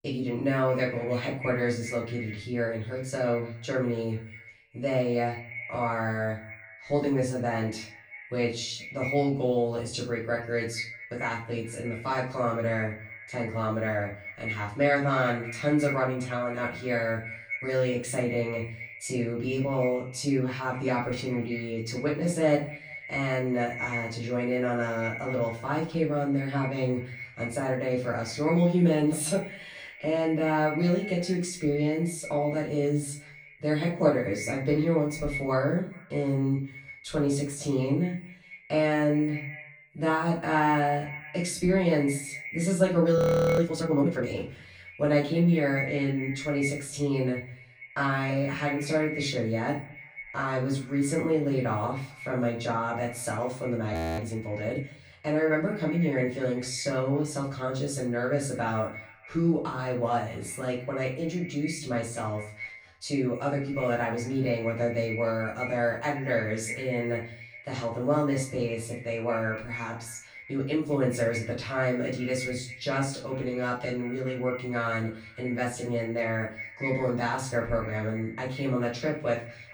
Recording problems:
off-mic speech; far
echo of what is said; noticeable; throughout; 210 ms later, 15 dB below the speech
room echo; slight; dies away in 0.4 s
audio freezing; at 43 s and at 54 s

